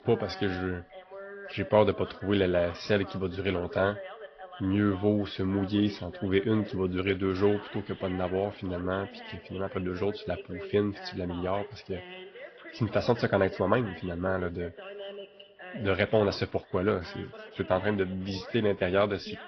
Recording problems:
high frequencies cut off; noticeable; nothing above 5.5 kHz
garbled, watery; slightly
voice in the background; noticeable; throughout; 15 dB below the speech

